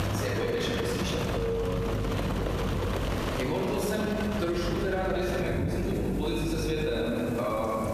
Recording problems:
off-mic speech; far
room echo; noticeable; dies away in 2 s
squashed, flat; somewhat
rain or running water; loud; throughout; 3 dB below the speech
electrical hum; noticeable; from 1.5 to 3 s and from 4.5 to 7 s; 50 Hz, 20 dB below the speech

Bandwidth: 14.5 kHz